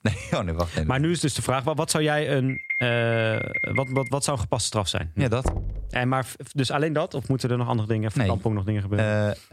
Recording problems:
squashed, flat; somewhat
alarm; noticeable; from 2.5 to 4 s; peak 2 dB below the speech
door banging; noticeable; at 5.5 s; peak 5 dB below the speech

